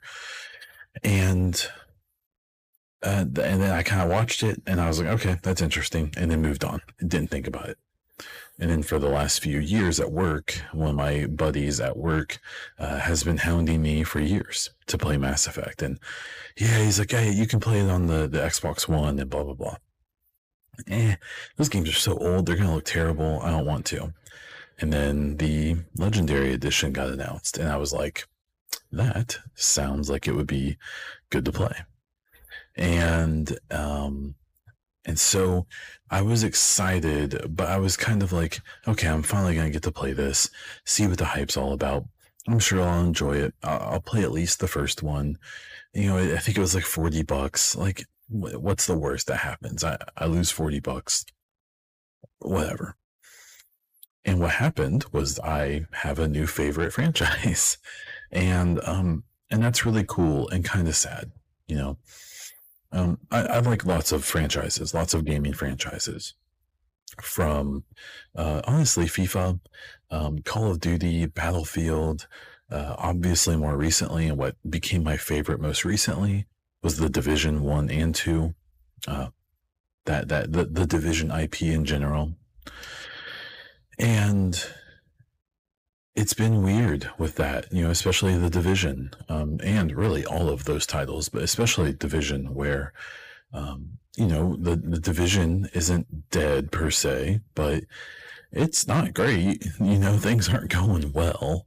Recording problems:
distortion; slight; 10 dB below the speech

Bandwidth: 15 kHz